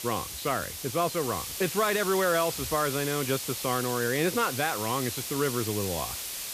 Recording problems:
hiss; loud; throughout; 4 dB below the speech

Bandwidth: 14.5 kHz